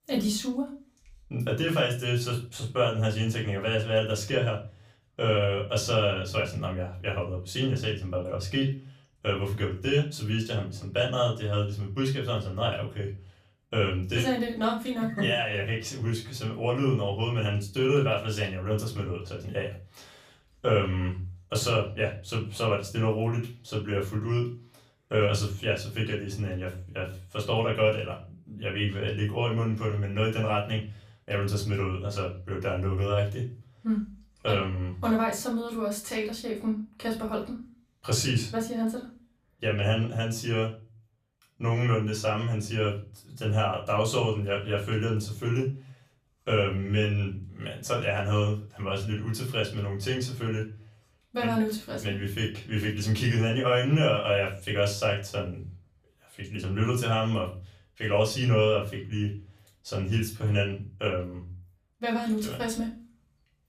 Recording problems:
off-mic speech; far
room echo; slight; dies away in 0.3 s

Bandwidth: 15 kHz